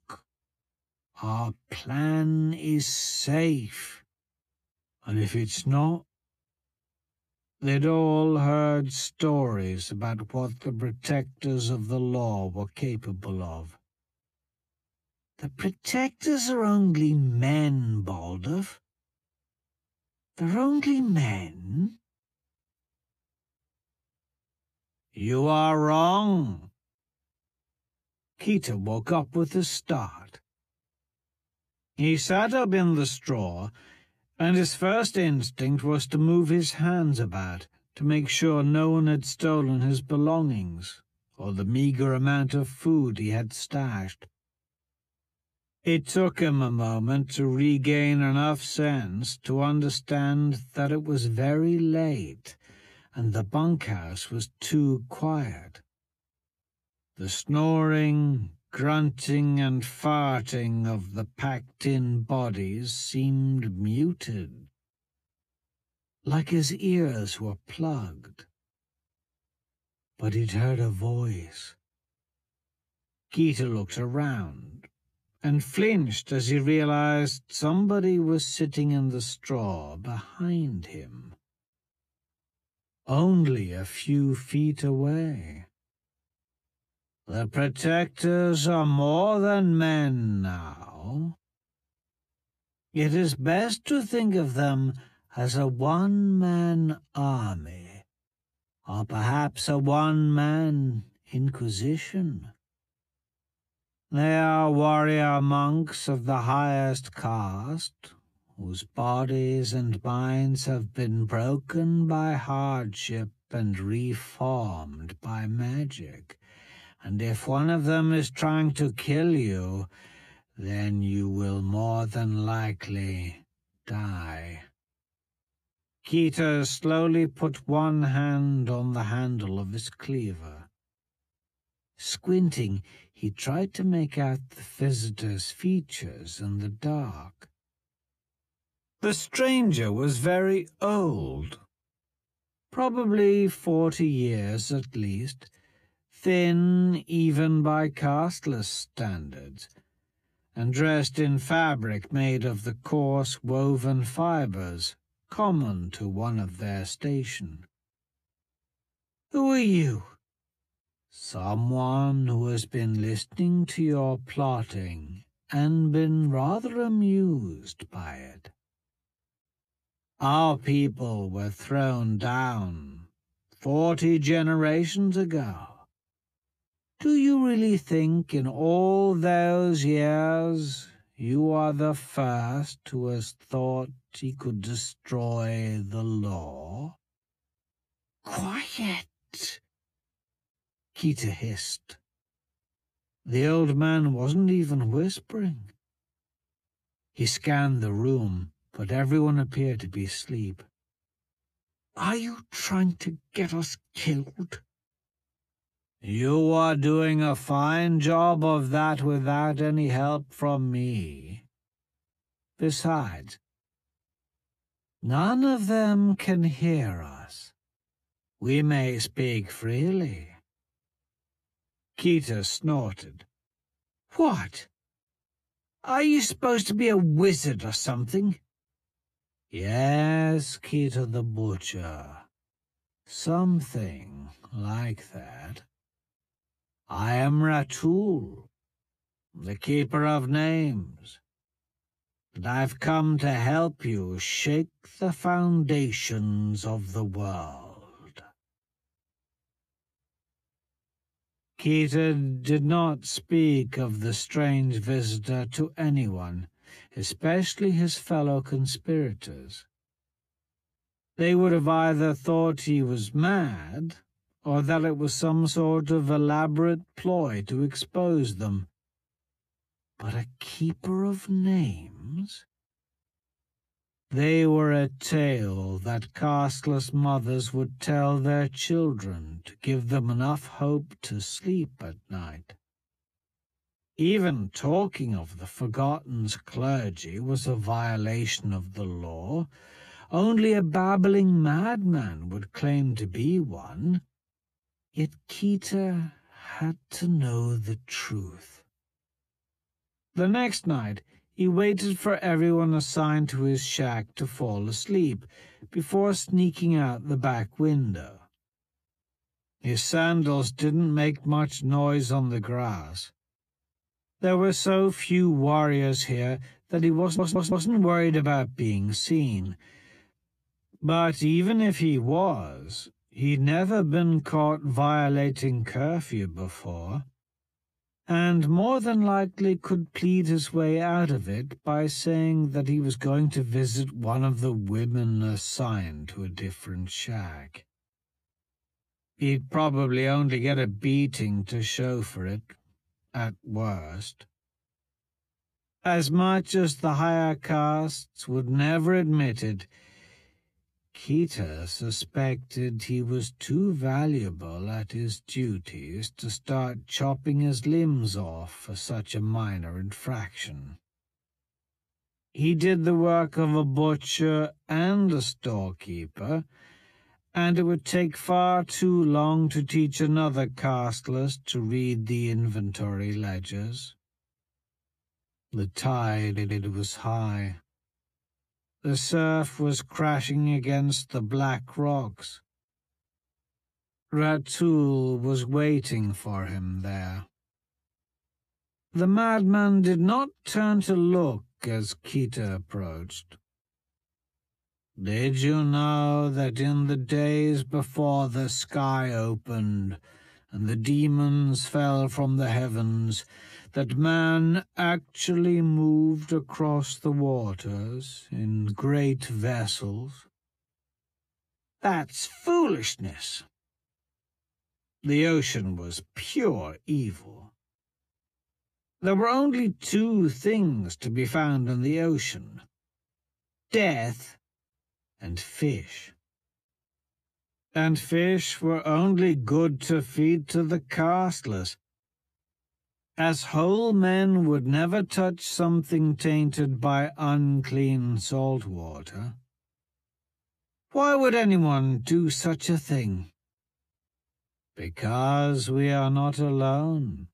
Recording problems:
wrong speed, natural pitch; too slow; 0.6 times normal speed
audio stuttering; at 5:17 and at 6:16

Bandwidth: 14.5 kHz